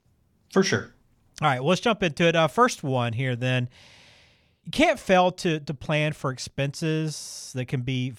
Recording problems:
none

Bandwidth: 18.5 kHz